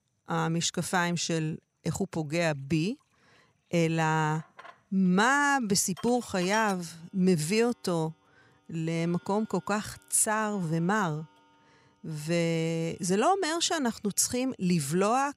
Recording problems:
household noises; faint; throughout; 20 dB below the speech

